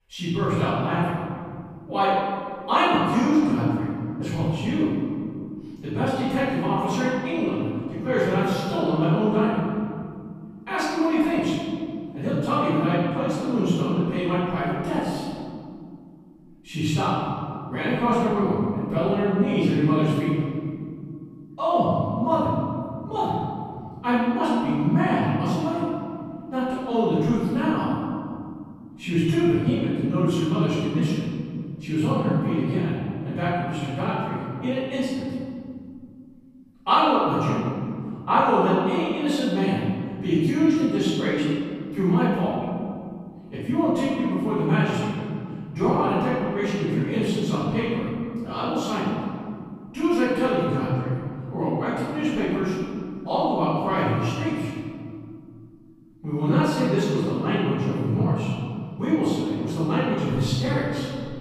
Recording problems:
room echo; strong; dies away in 2.4 s
off-mic speech; far

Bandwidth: 15 kHz